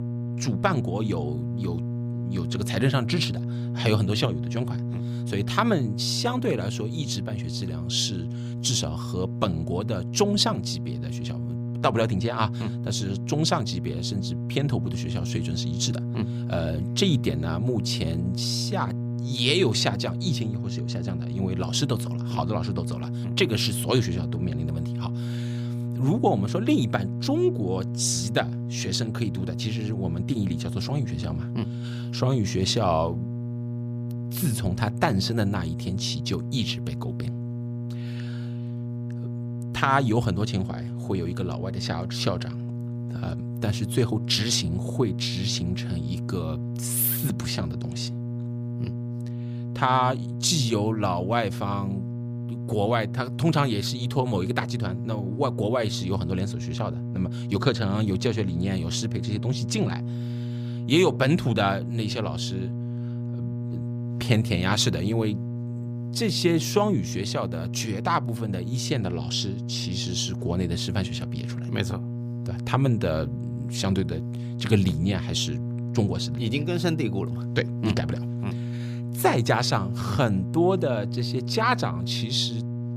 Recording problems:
electrical hum; noticeable; throughout; 60 Hz, 10 dB below the speech

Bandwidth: 15 kHz